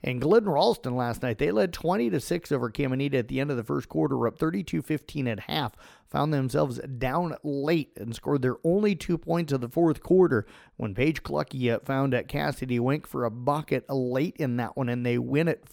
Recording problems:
none

